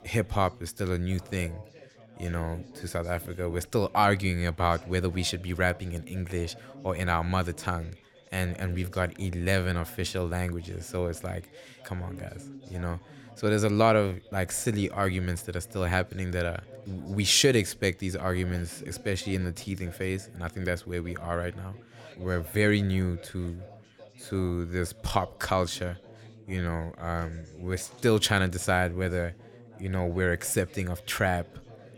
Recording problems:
background chatter; faint; throughout; 4 voices, 20 dB below the speech

